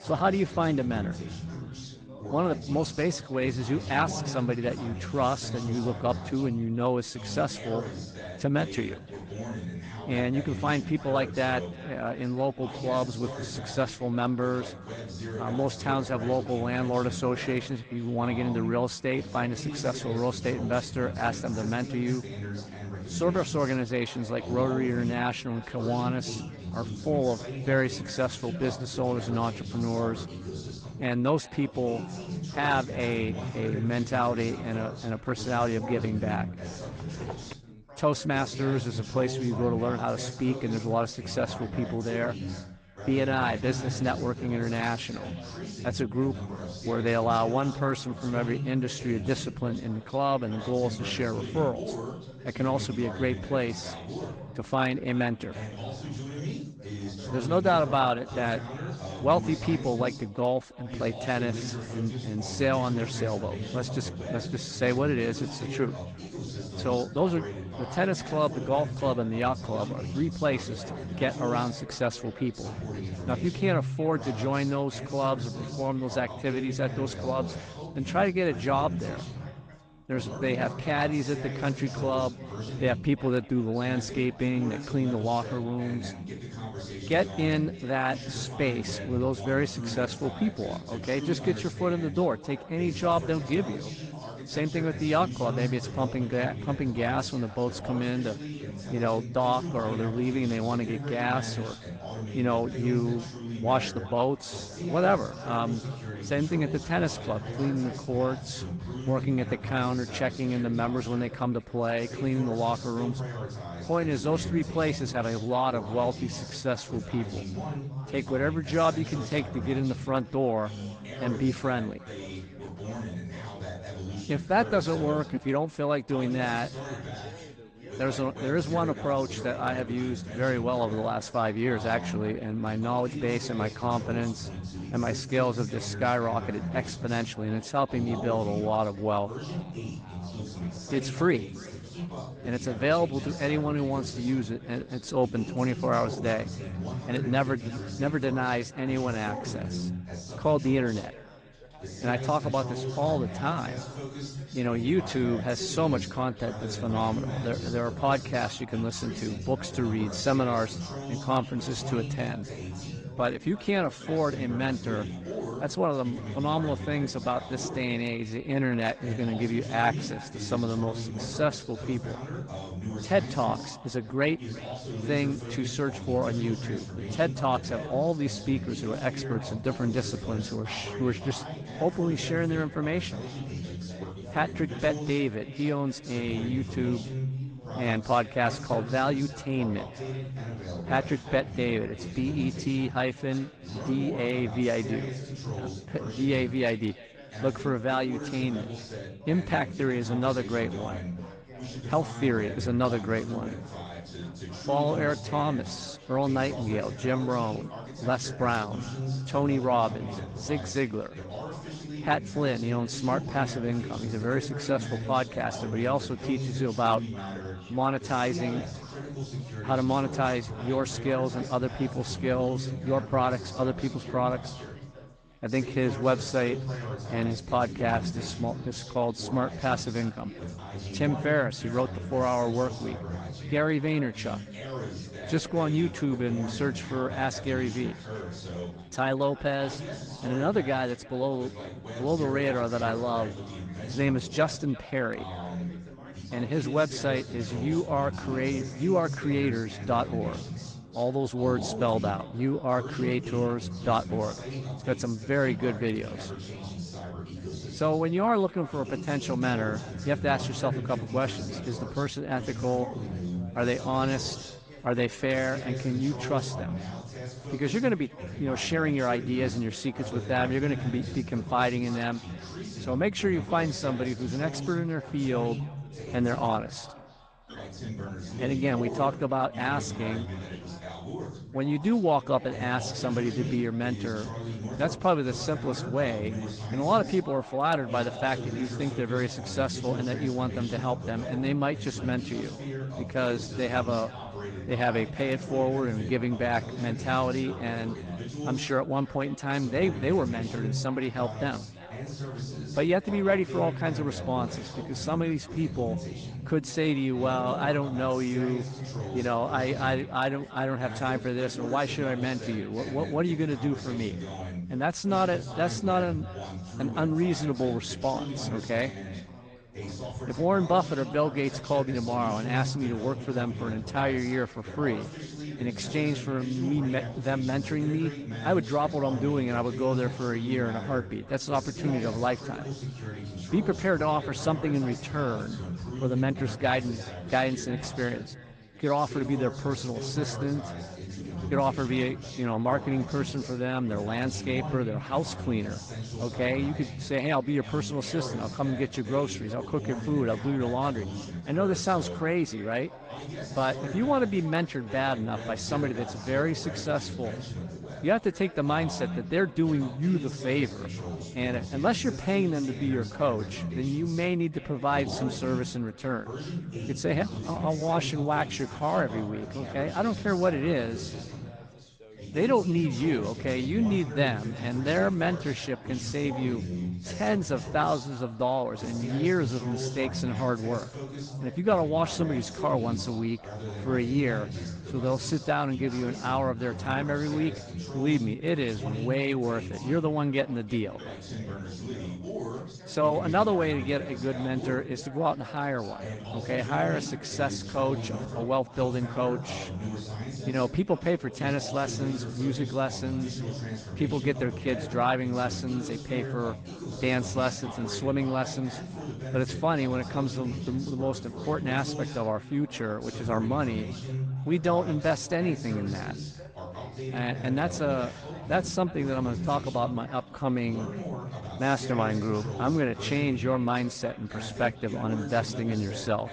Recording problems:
echo of what is said; faint; throughout; 350 ms later, 25 dB below the speech
garbled, watery; slightly
background chatter; loud; throughout; 3 voices, 8 dB below the speech
footsteps; faint; at 37 s; peak 10 dB below the speech

